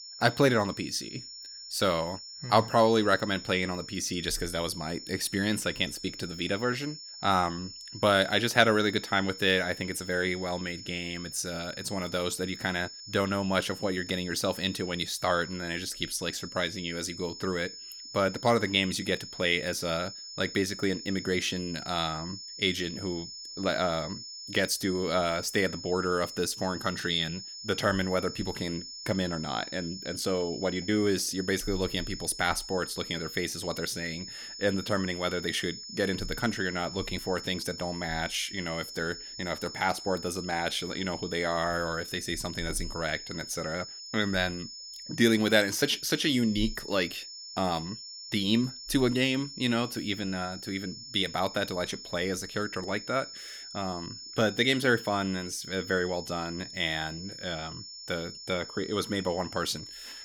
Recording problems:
high-pitched whine; noticeable; throughout; 5.5 kHz, 10 dB below the speech

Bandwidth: 18.5 kHz